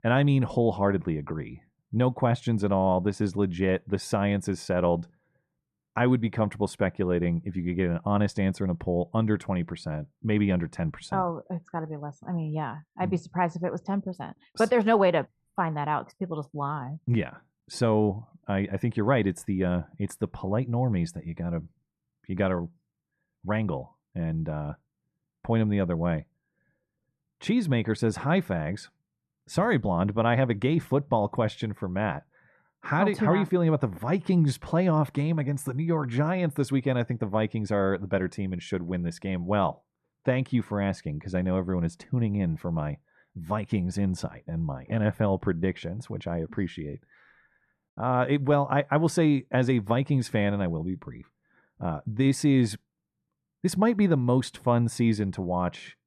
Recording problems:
muffled; slightly; fading above 2.5 kHz

